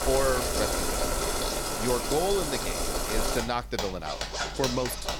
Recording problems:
household noises; very loud; throughout; 1 dB above the speech

